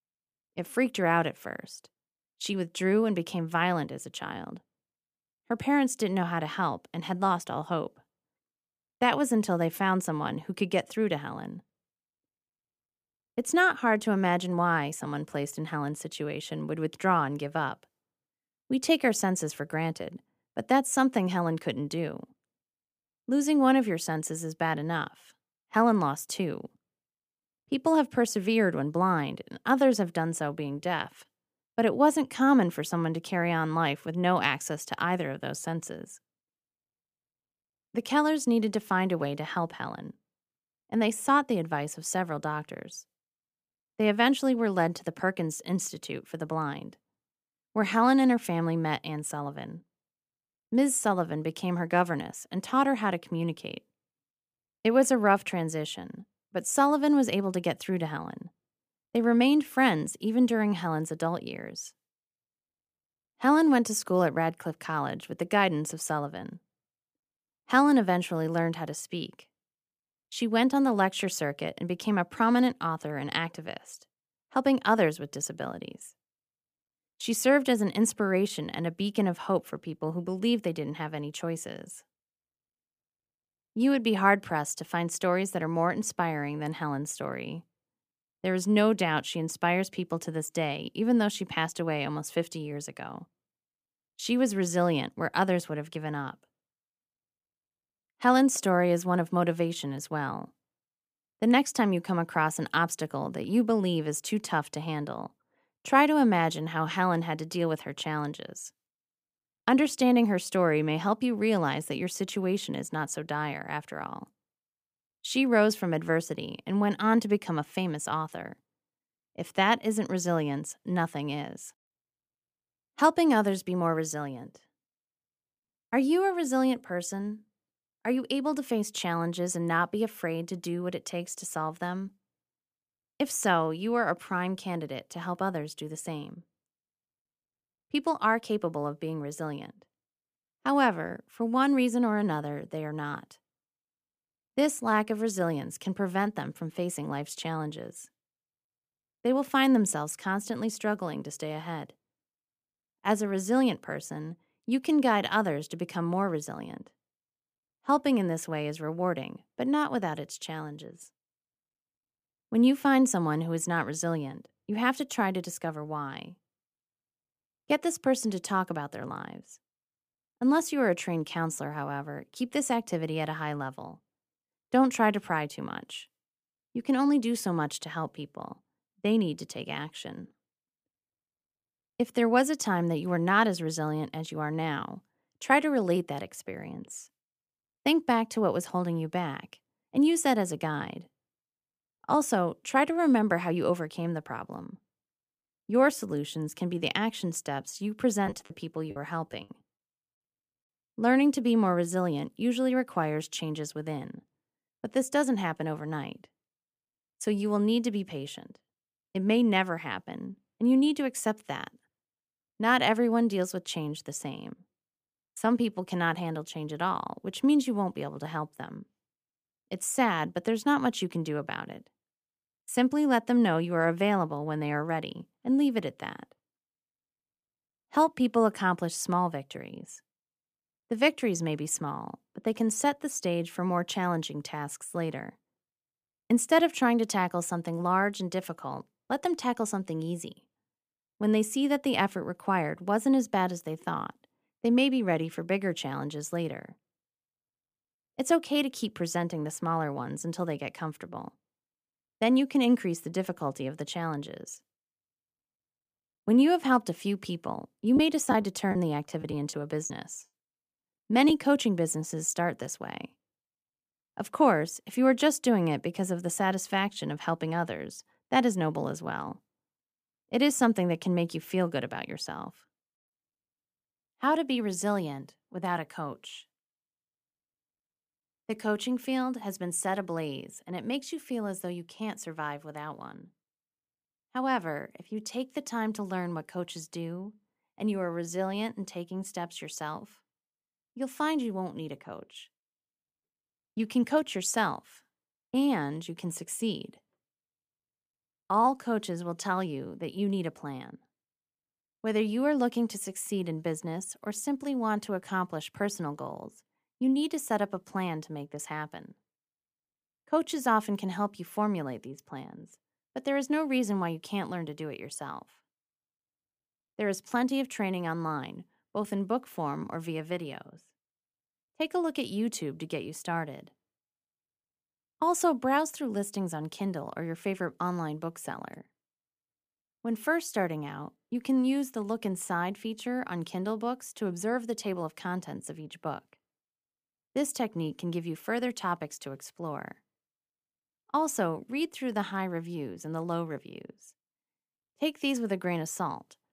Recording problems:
choppy; very; from 3:18 to 3:19 and from 4:18 to 4:21; 9% of the speech affected

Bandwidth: 15 kHz